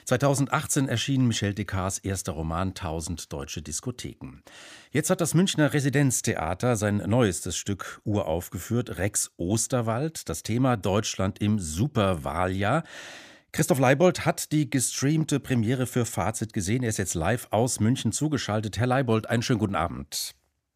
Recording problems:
none

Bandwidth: 15 kHz